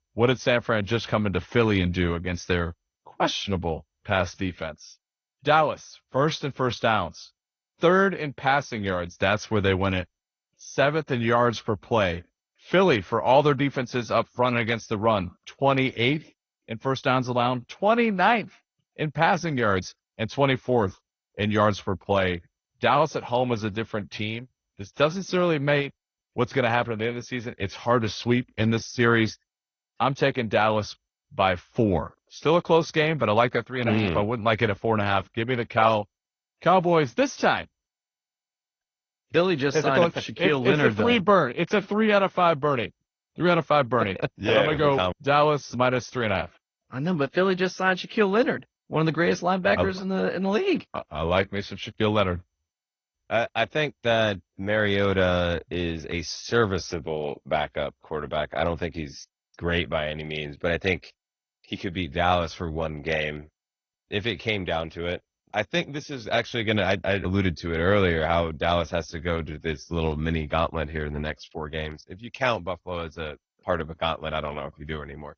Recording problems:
garbled, watery; slightly; nothing above 6.5 kHz

